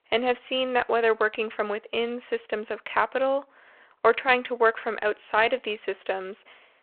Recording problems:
phone-call audio

